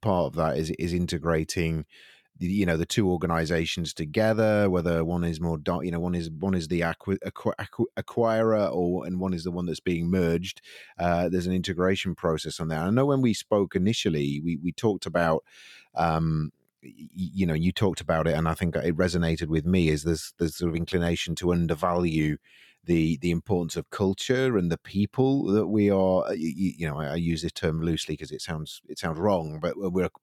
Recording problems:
none

